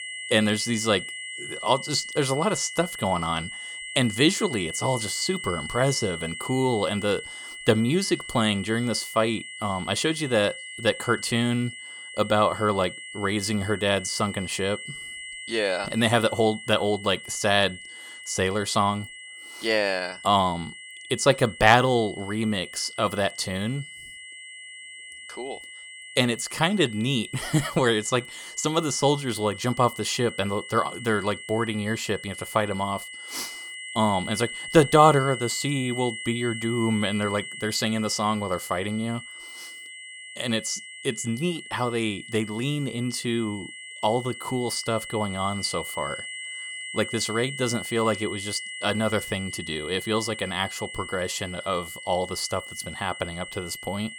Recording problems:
high-pitched whine; noticeable; throughout; 2 kHz, 10 dB below the speech

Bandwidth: 17 kHz